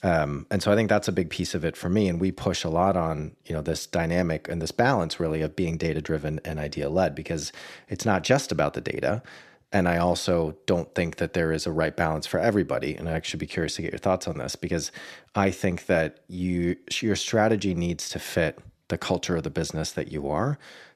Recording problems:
none

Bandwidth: 14 kHz